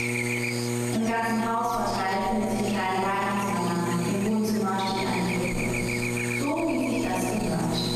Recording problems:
room echo; strong; dies away in 1.6 s
off-mic speech; far
squashed, flat; heavily
electrical hum; loud; throughout; 60 Hz, 5 dB below the speech

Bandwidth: 14 kHz